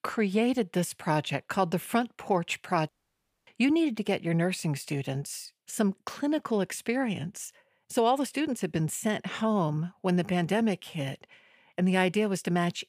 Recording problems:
audio cutting out; at 3 s for 0.5 s

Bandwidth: 15 kHz